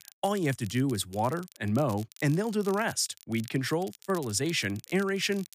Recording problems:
crackle, like an old record; faint; 20 dB below the speech

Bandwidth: 15 kHz